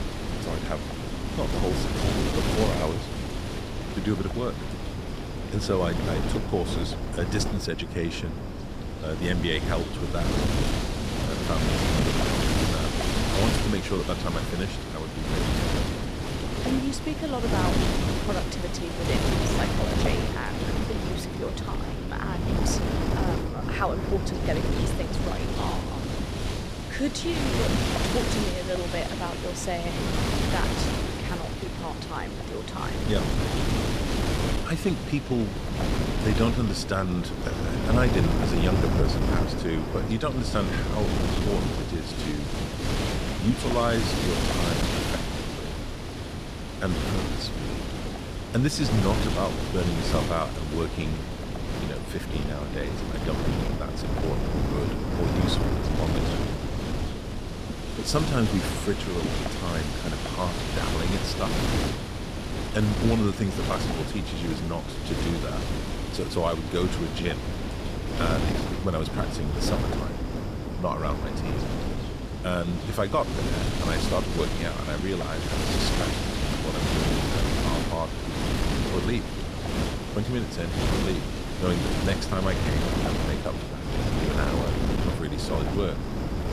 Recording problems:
wind noise on the microphone; heavy; 1 dB above the speech

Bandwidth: 14.5 kHz